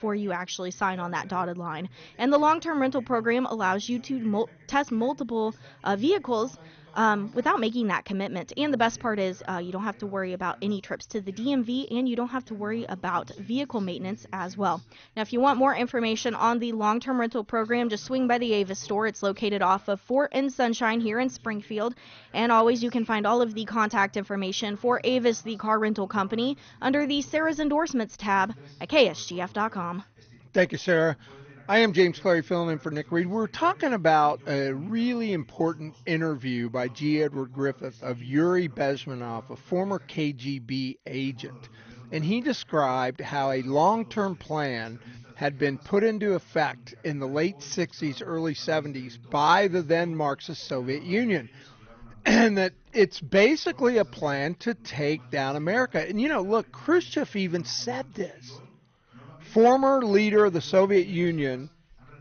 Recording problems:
garbled, watery; slightly; nothing above 6.5 kHz
voice in the background; faint; throughout; 25 dB below the speech

